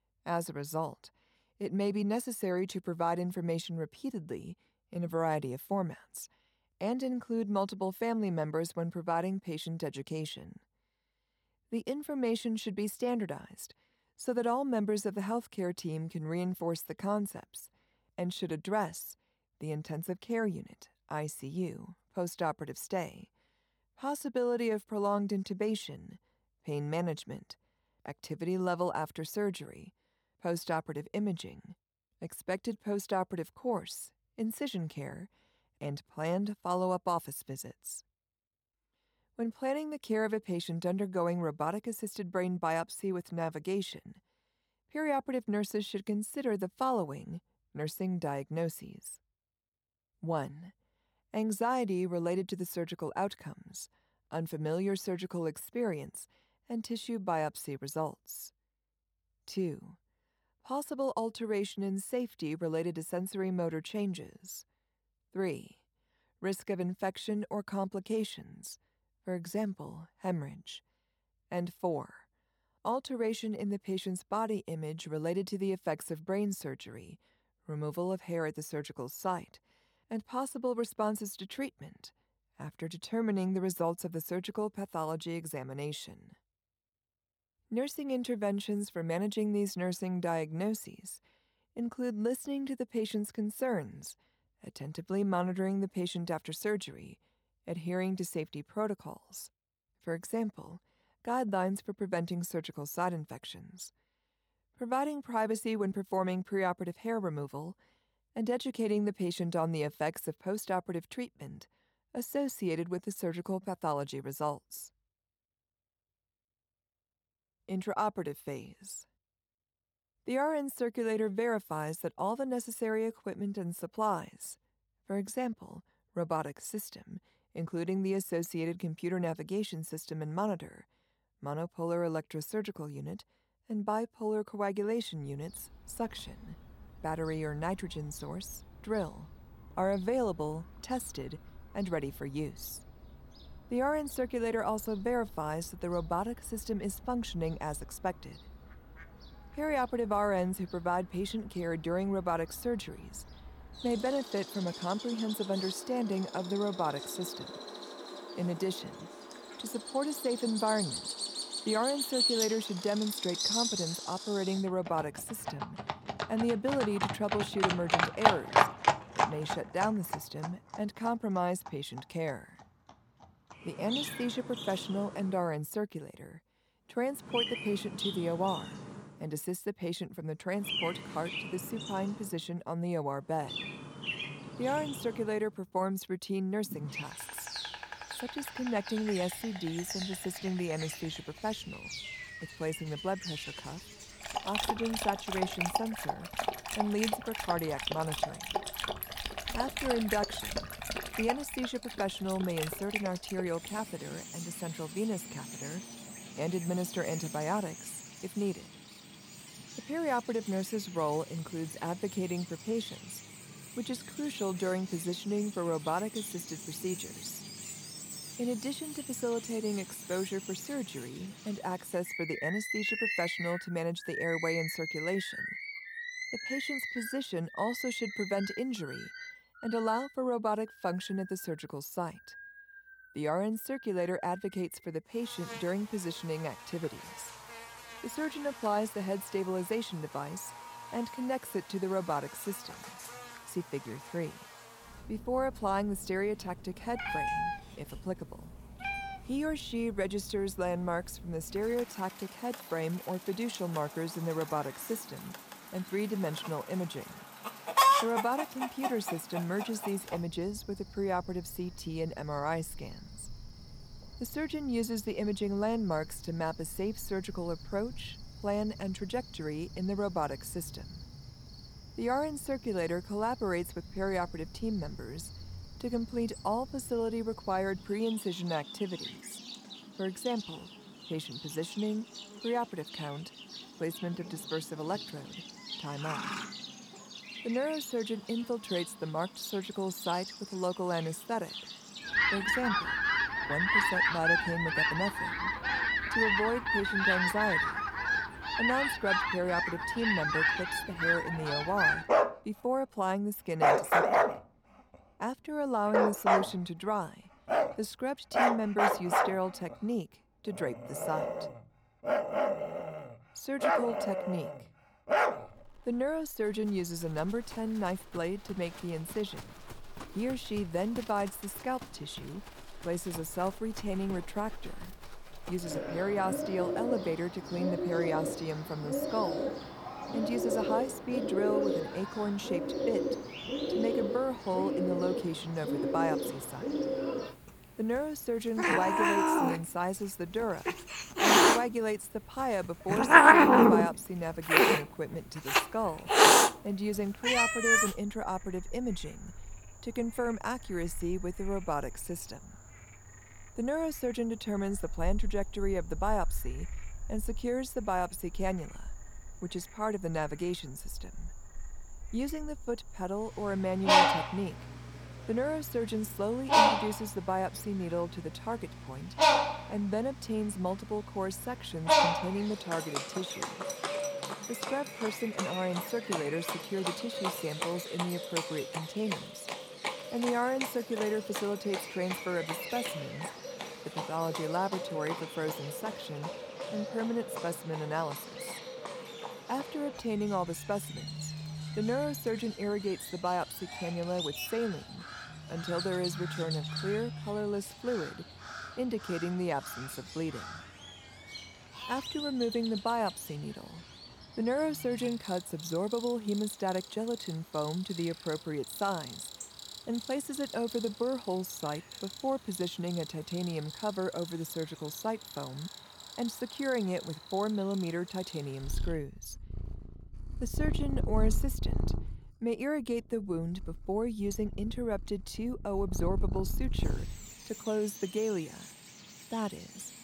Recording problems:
animal sounds; very loud; from 2:16 on; 3 dB above the speech

